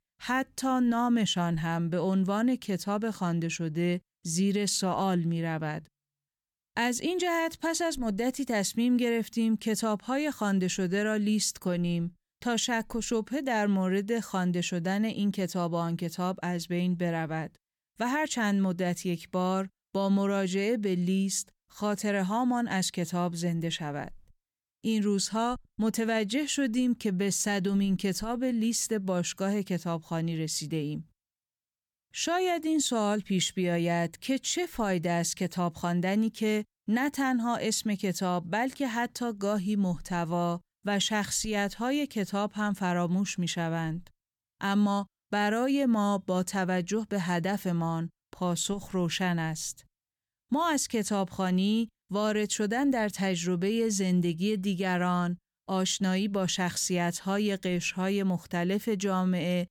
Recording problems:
none

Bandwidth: 18 kHz